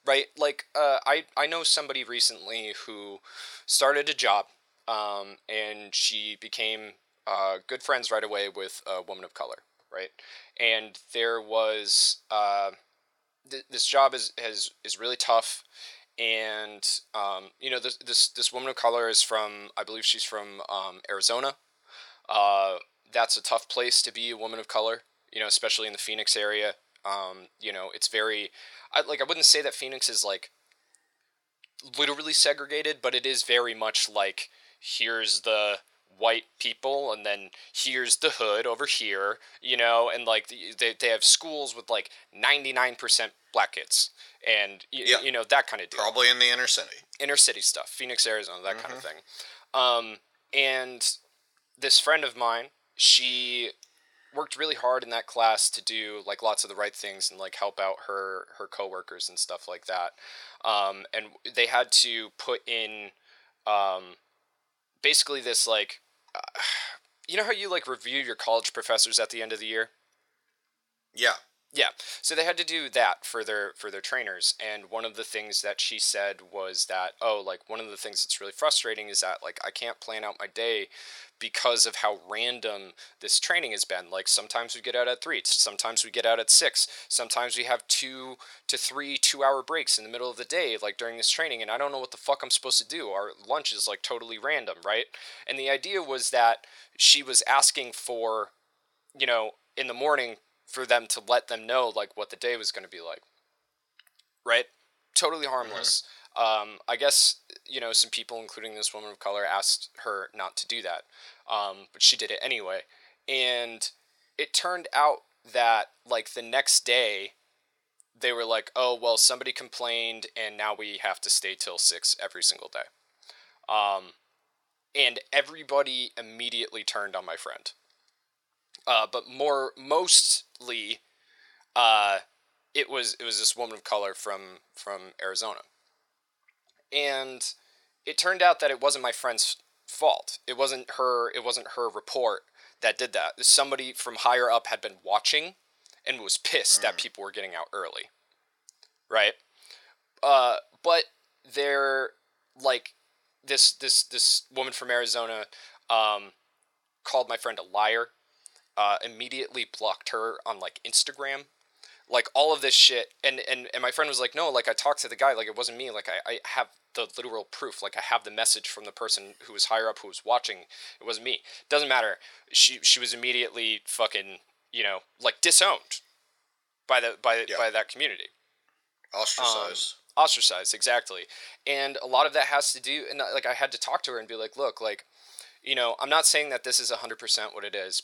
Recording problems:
thin; very; fading below 650 Hz

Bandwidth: 17.5 kHz